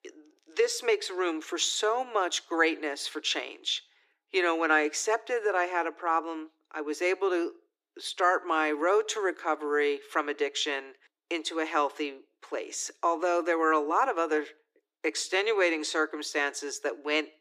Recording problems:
thin; somewhat; fading below 300 Hz

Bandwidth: 14.5 kHz